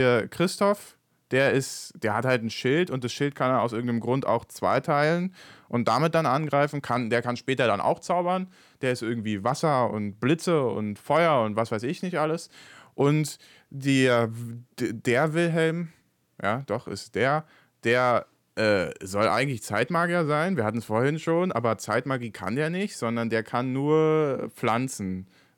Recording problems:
abrupt cut into speech; at the start

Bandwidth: 18 kHz